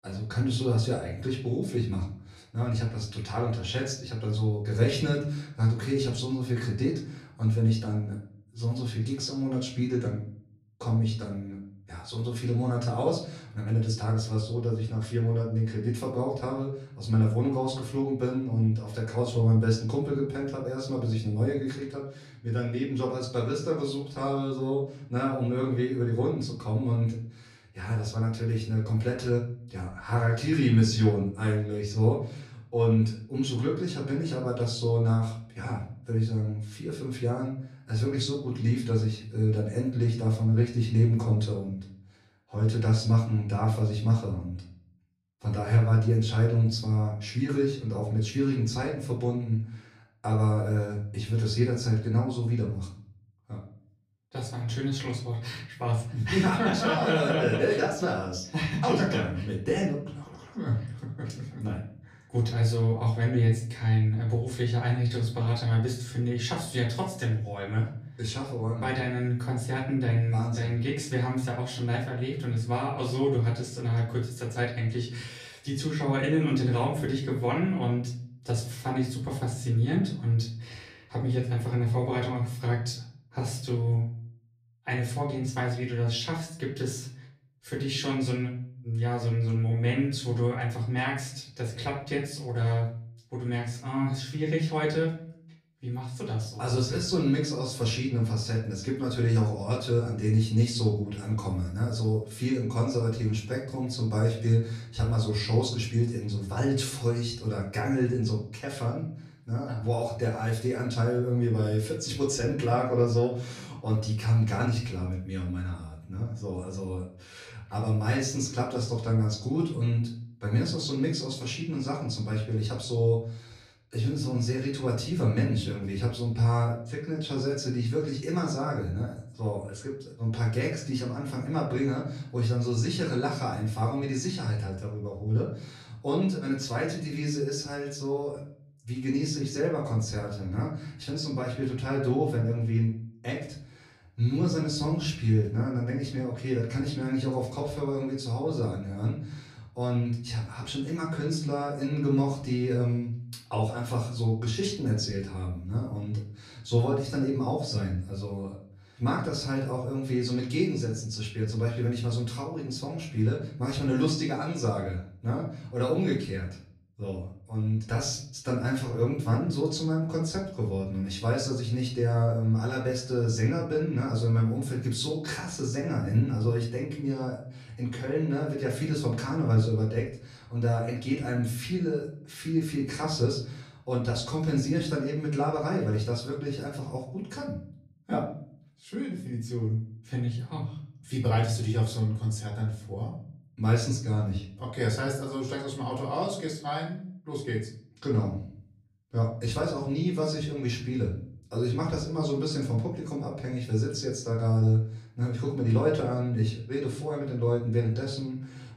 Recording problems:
off-mic speech; far
room echo; slight; dies away in 0.5 s

